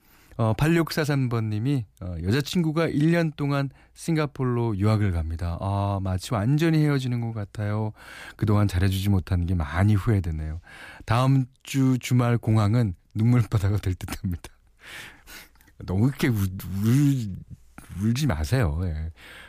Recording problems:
none

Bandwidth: 15 kHz